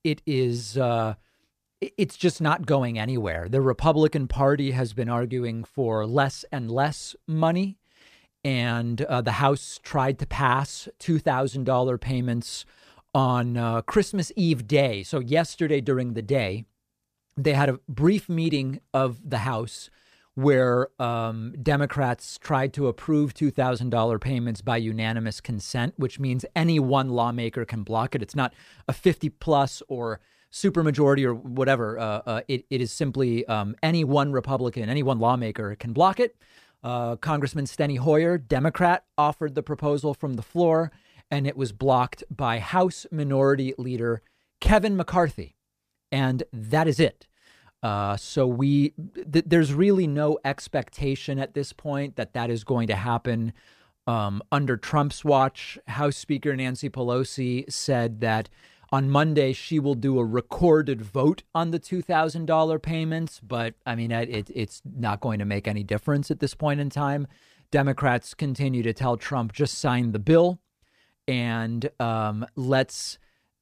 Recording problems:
none

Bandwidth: 14.5 kHz